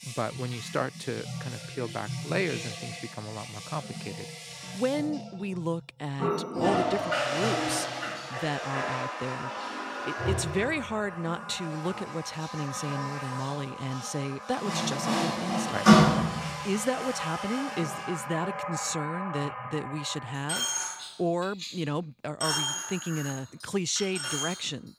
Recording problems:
household noises; very loud; throughout; 2 dB above the speech

